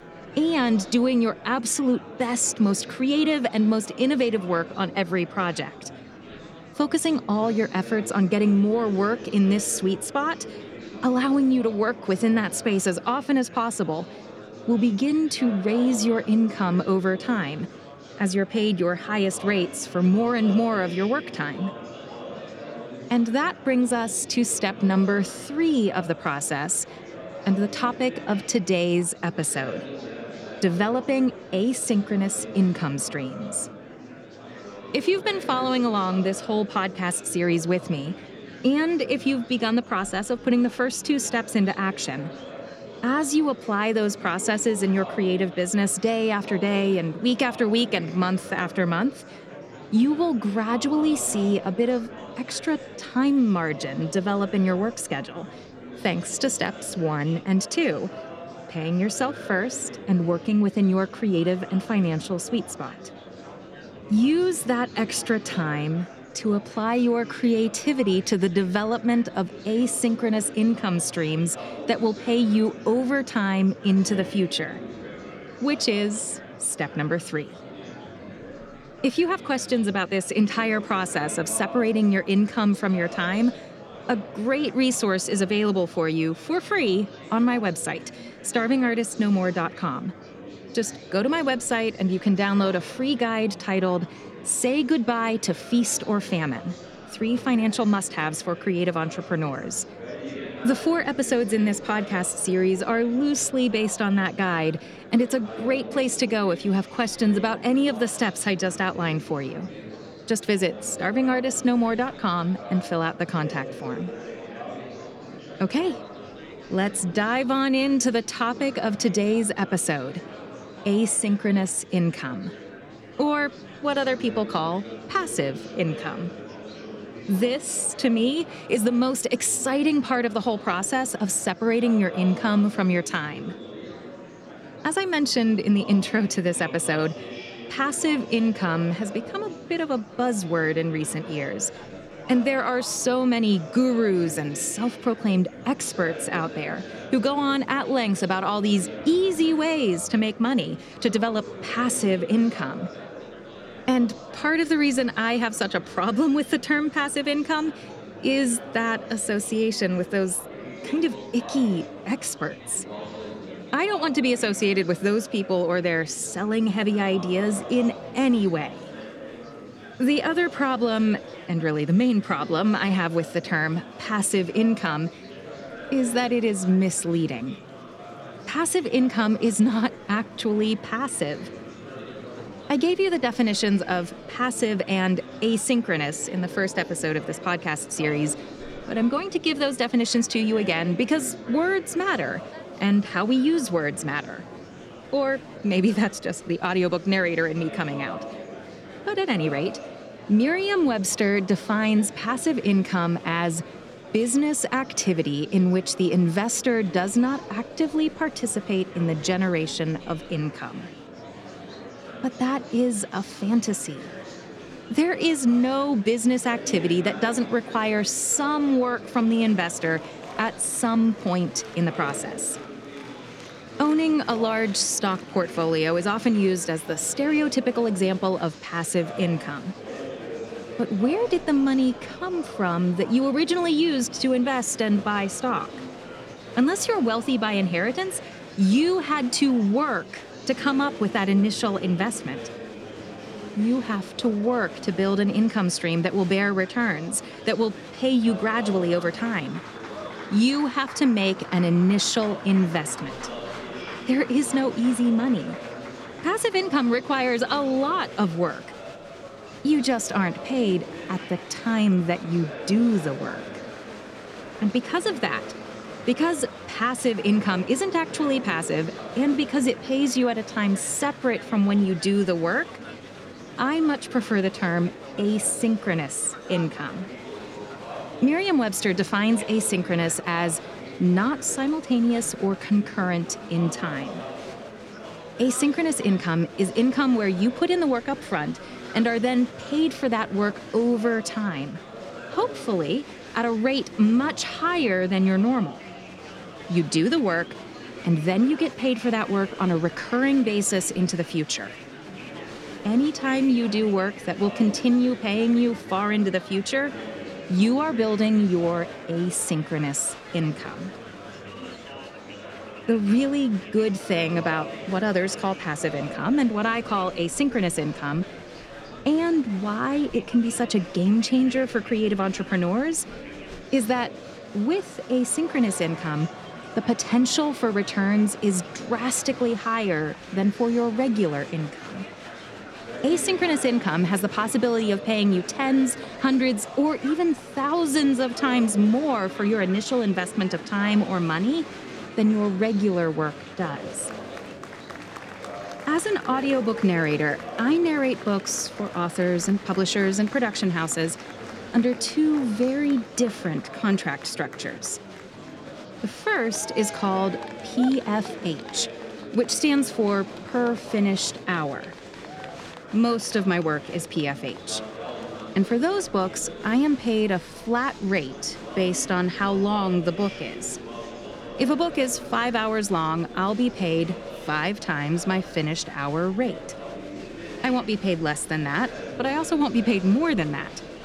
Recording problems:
murmuring crowd; noticeable; throughout; 15 dB below the speech

